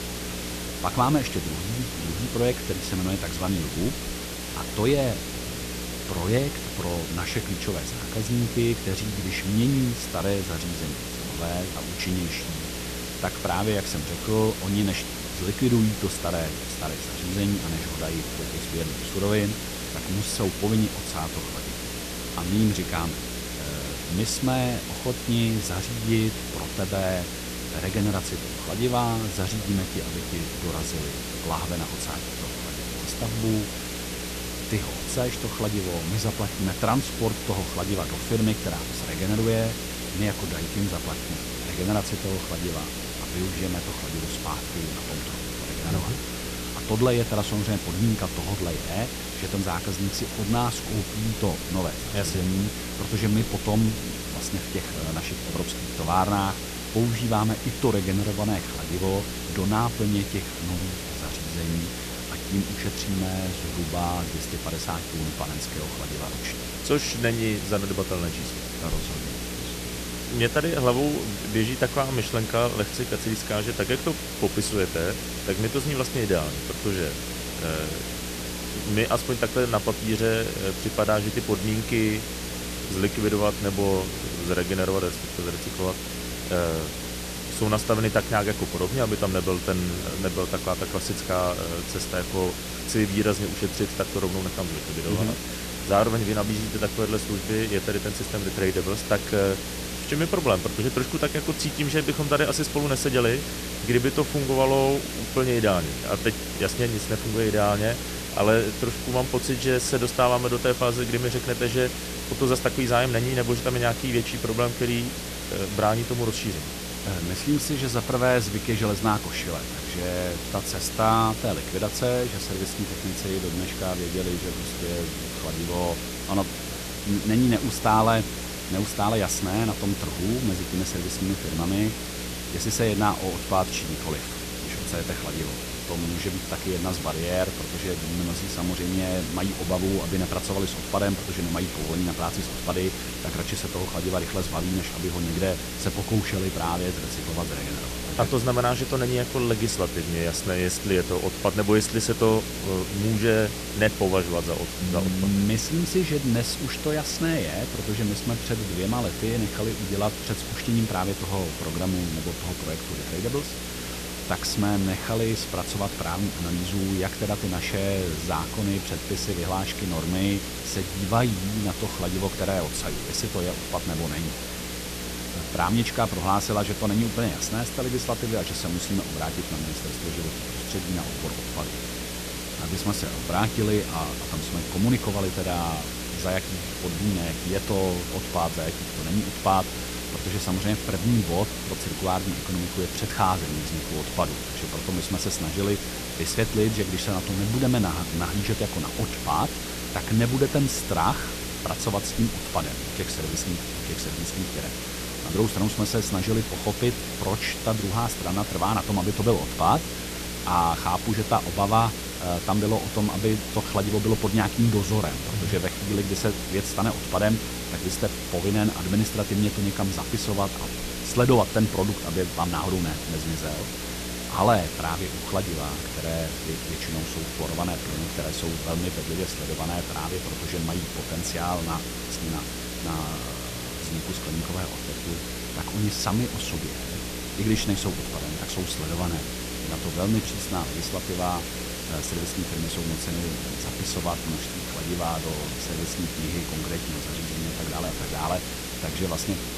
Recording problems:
hiss; loud; throughout; 5 dB below the speech
electrical hum; noticeable; throughout; 60 Hz, 15 dB below the speech
background chatter; faint; throughout; 3 voices, 20 dB below the speech

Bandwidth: 14.5 kHz